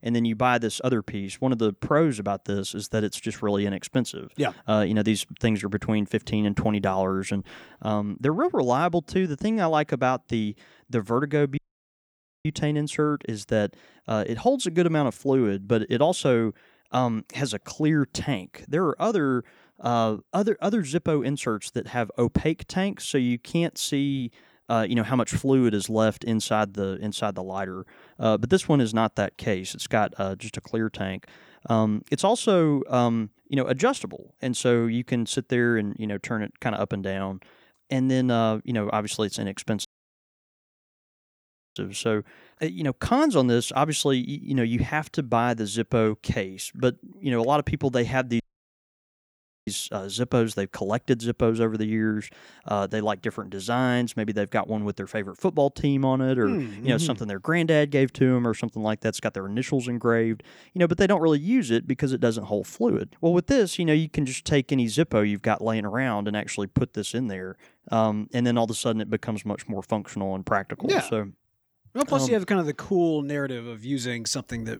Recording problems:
audio cutting out; at 12 s for 1 s, at 40 s for 2 s and at 48 s for 1.5 s

